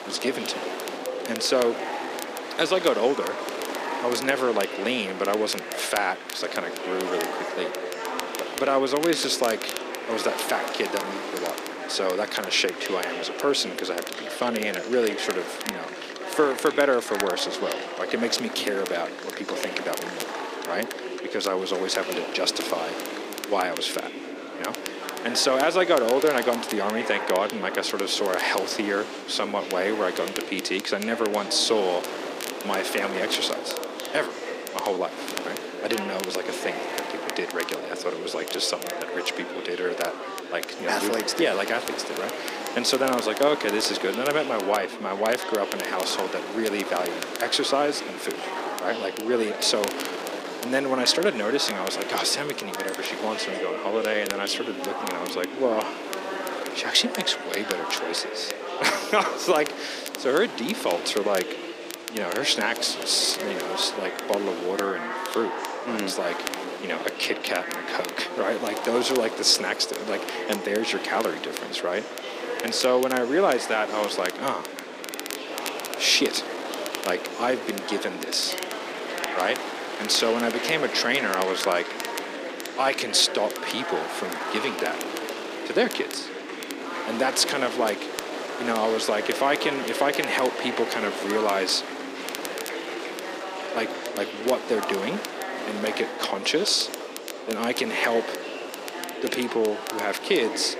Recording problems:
thin; somewhat; fading below 300 Hz
chatter from many people; loud; throughout; 8 dB below the speech
wind noise on the microphone; occasional gusts; 10 dB below the speech
crackle, like an old record; noticeable; 15 dB below the speech

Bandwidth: 14.5 kHz